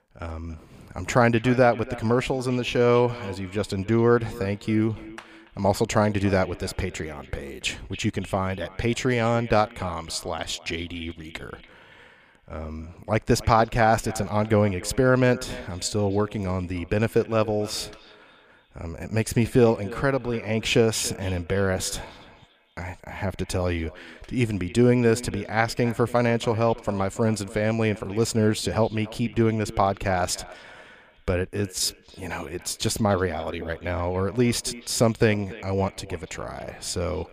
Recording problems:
echo of what is said; faint; throughout; 280 ms later, 20 dB below the speech

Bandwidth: 15 kHz